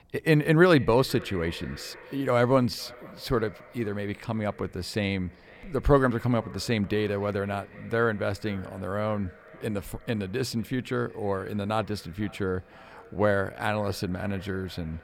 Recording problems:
echo of what is said; faint; throughout; 500 ms later, 20 dB below the speech

